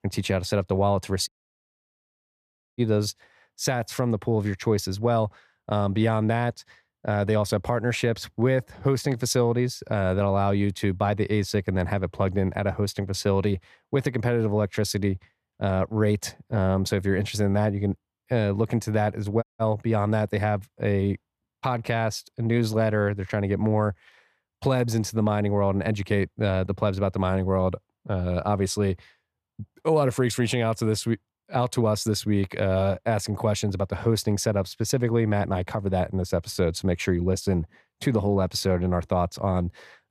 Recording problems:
audio cutting out; at 1.5 s for 1.5 s and at 19 s

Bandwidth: 14.5 kHz